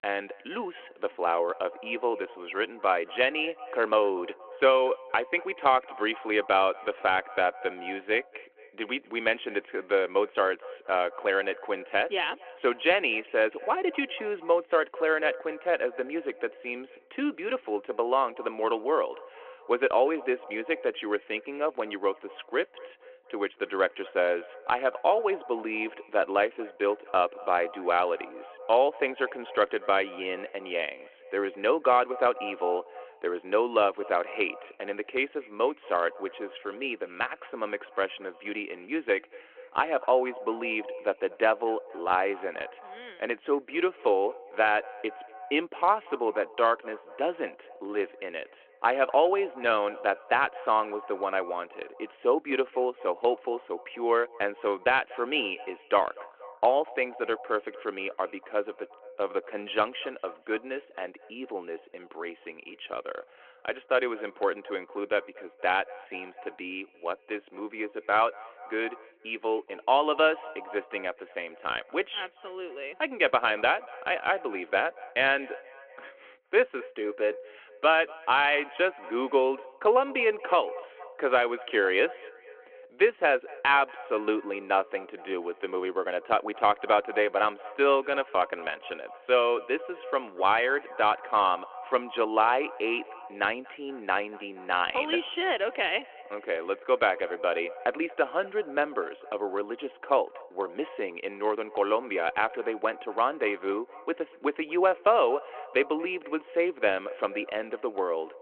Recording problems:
echo of what is said; noticeable; throughout; 240 ms later, 20 dB below the speech
phone-call audio

